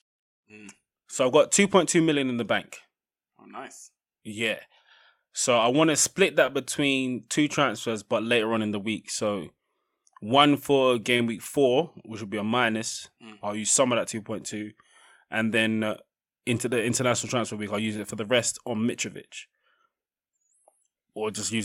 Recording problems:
abrupt cut into speech; at the end

